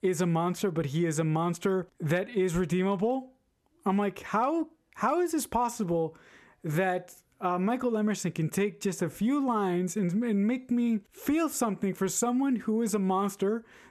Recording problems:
squashed, flat; somewhat

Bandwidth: 13.5 kHz